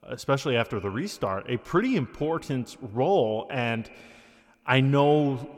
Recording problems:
echo of what is said; faint; throughout; 120 ms later, 20 dB below the speech

